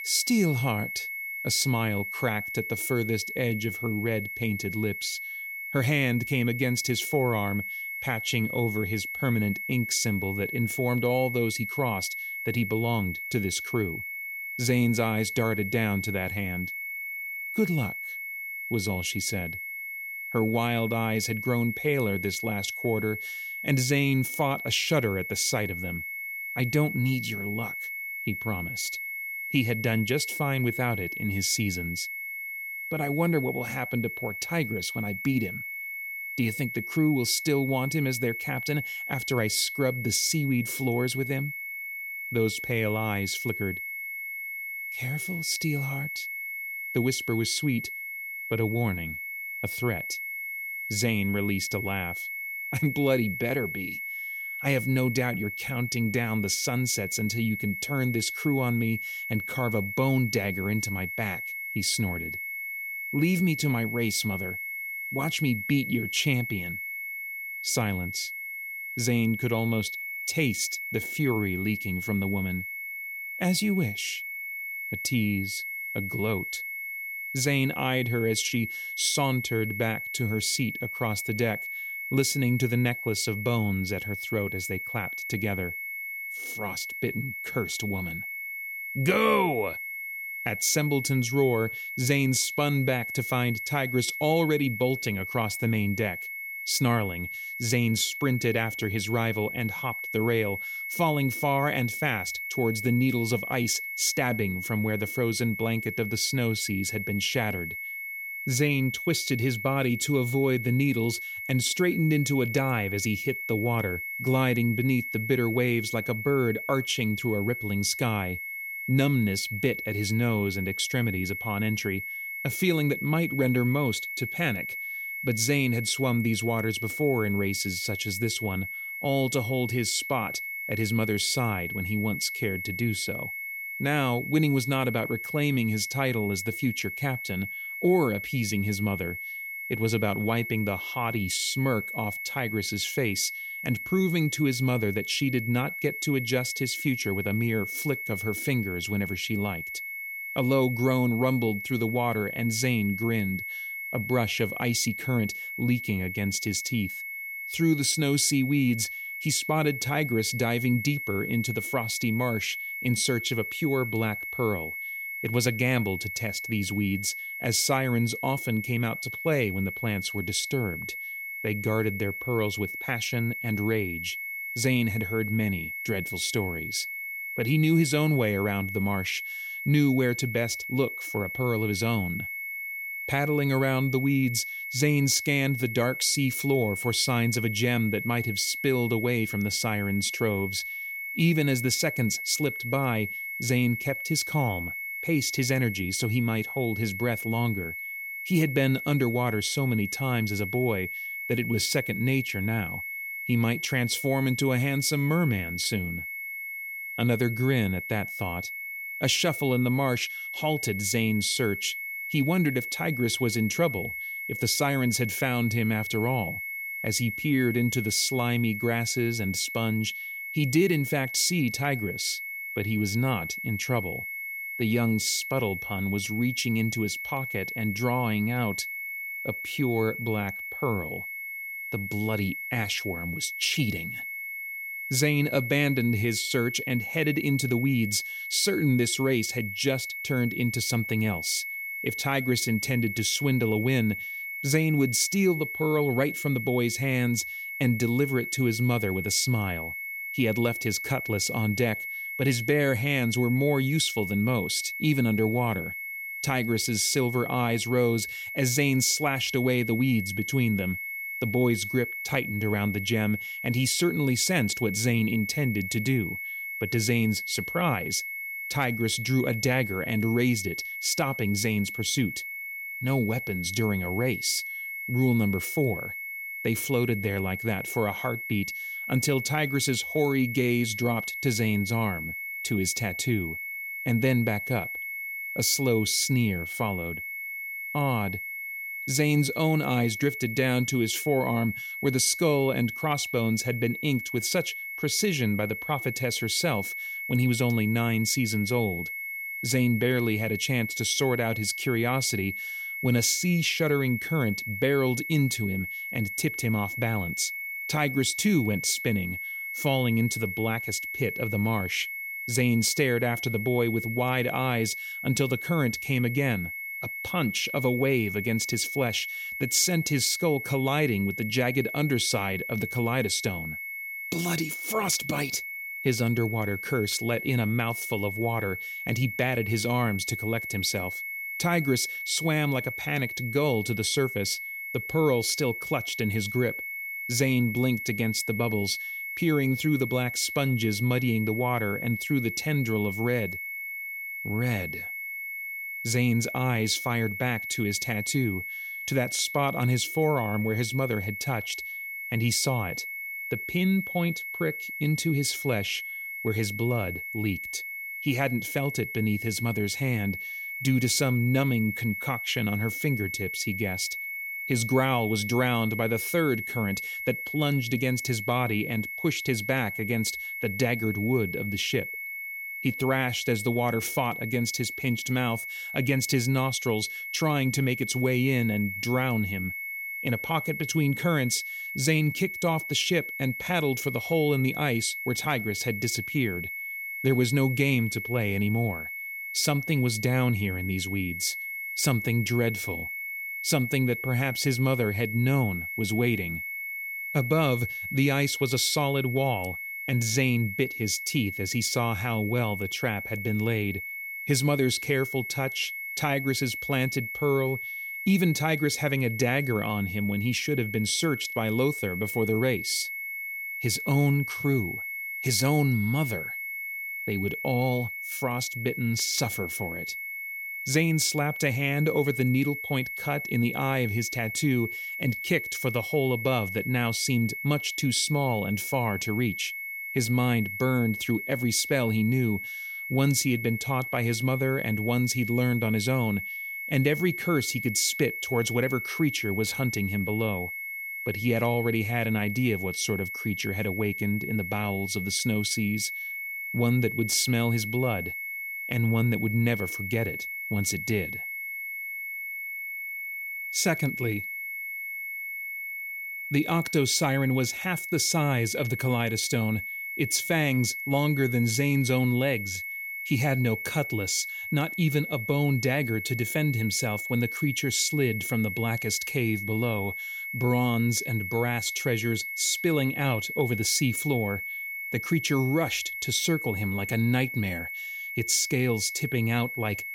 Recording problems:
high-pitched whine; loud; throughout; 2 kHz, 6 dB below the speech

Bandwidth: 16.5 kHz